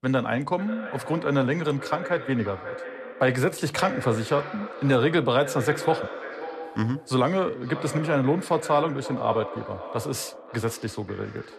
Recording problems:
echo of what is said; strong; throughout; 540 ms later, 10 dB below the speech

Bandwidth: 13.5 kHz